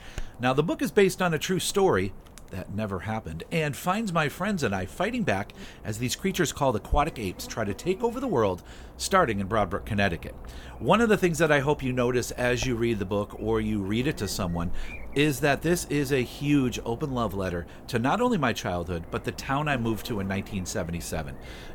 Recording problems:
electrical hum; faint; throughout; 50 Hz, 20 dB below the speech

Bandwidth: 17 kHz